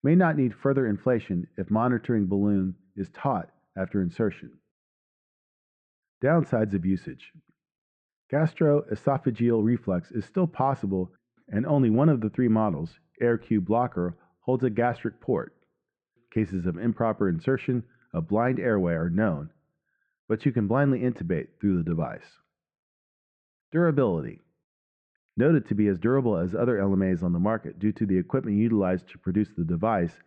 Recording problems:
muffled; very; fading above 2 kHz

